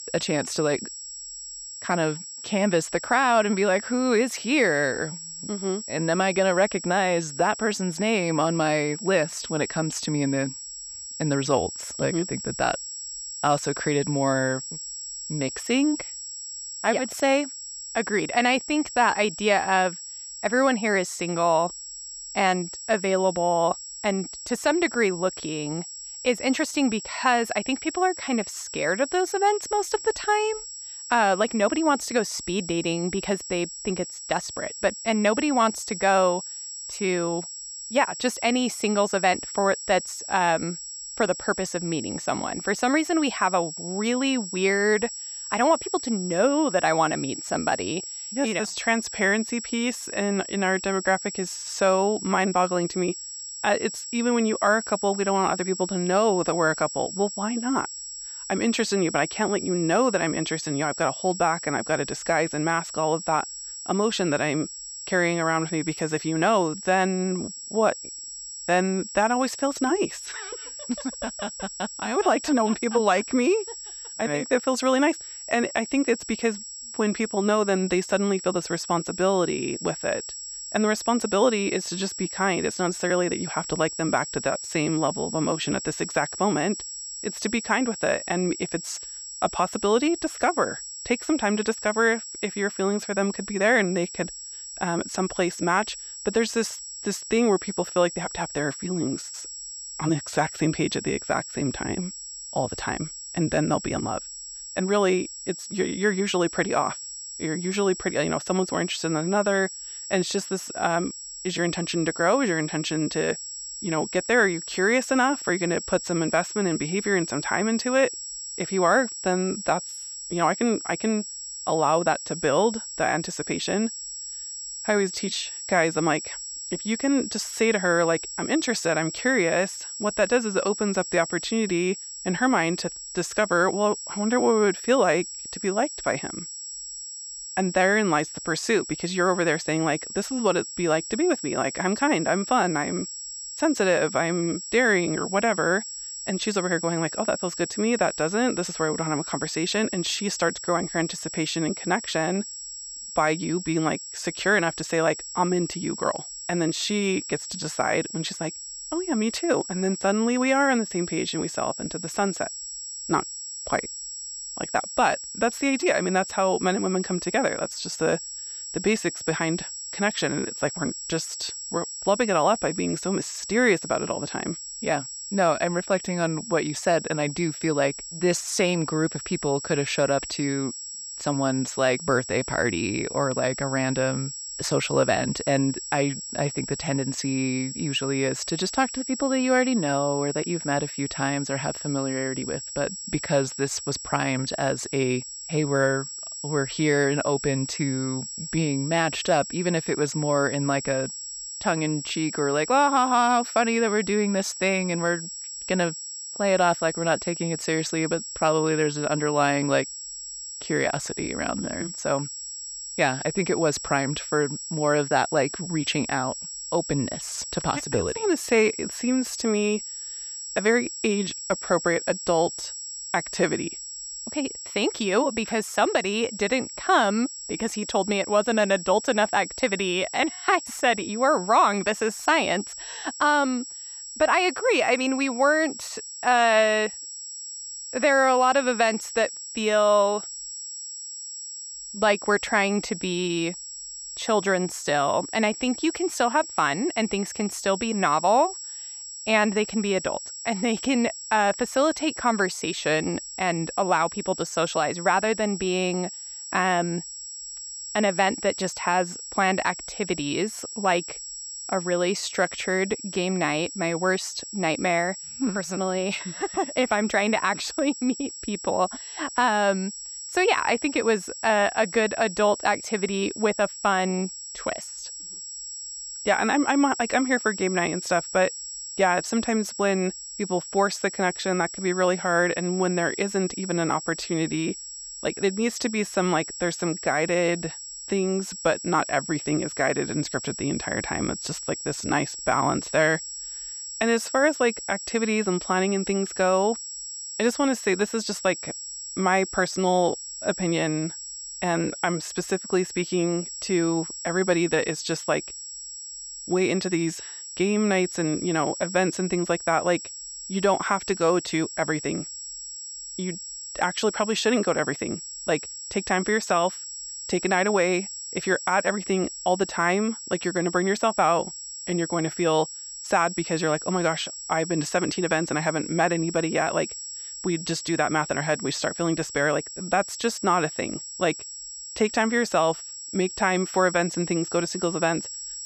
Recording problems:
high-pitched whine; loud; throughout; 7.5 kHz, 9 dB below the speech

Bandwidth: 14.5 kHz